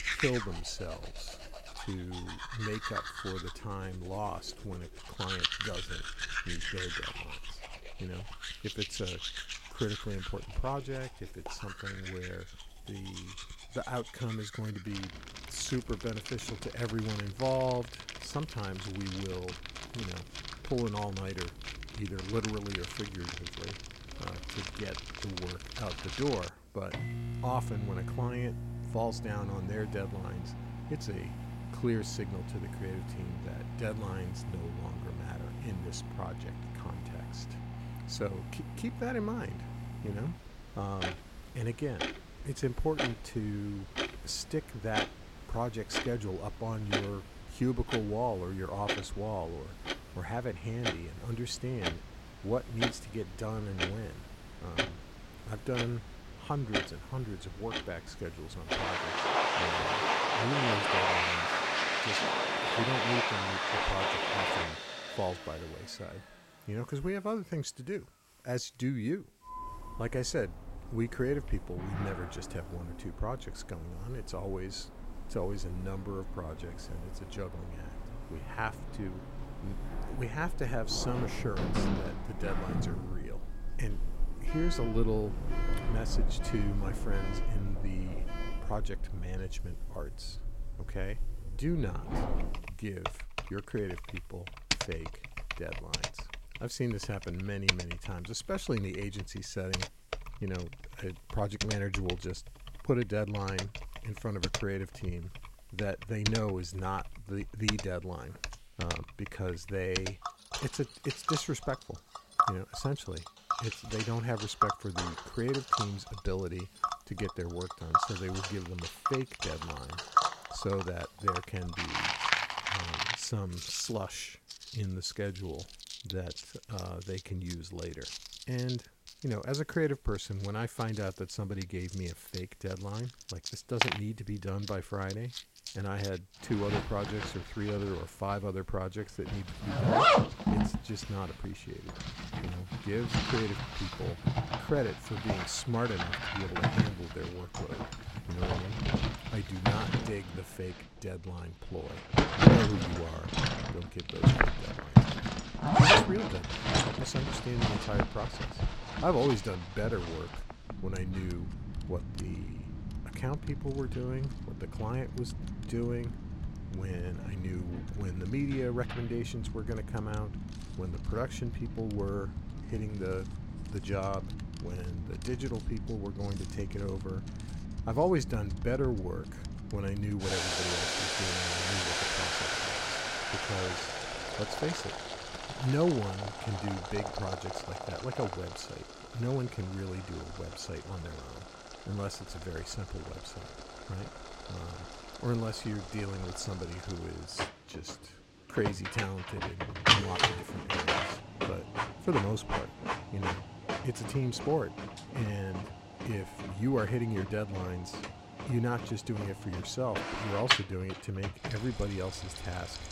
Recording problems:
household noises; very loud; throughout; 3 dB above the speech
hiss; faint; until 2:30; 30 dB below the speech

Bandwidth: 16 kHz